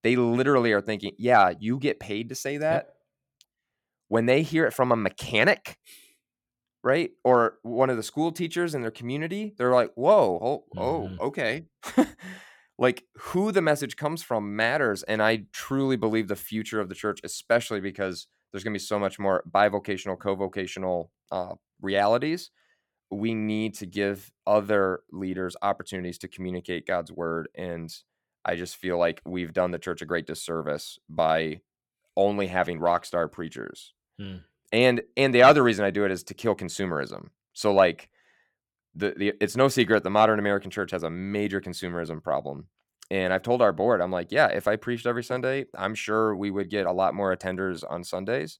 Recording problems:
none

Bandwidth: 17 kHz